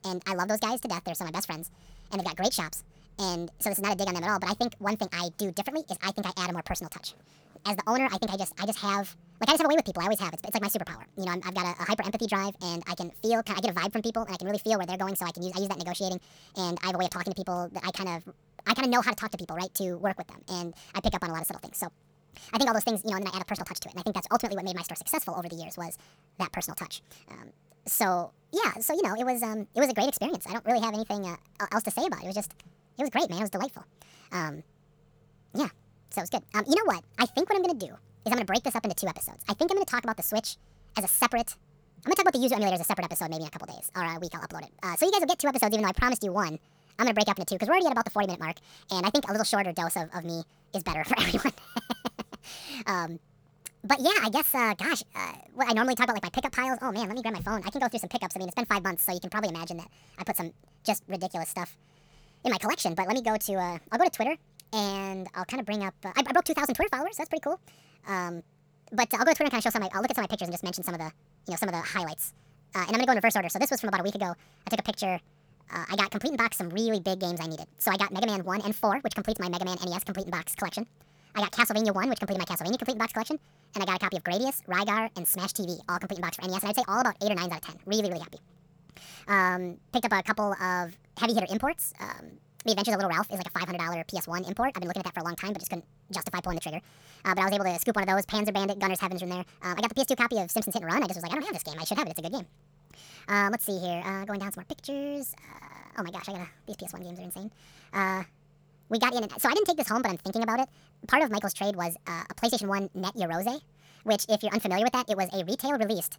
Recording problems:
wrong speed and pitch; too fast and too high; 1.6 times normal speed

